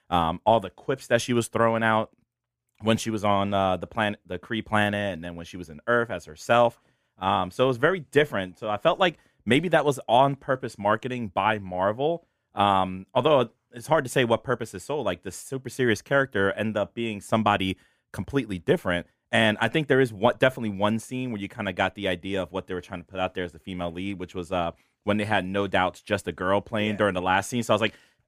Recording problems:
none

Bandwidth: 15 kHz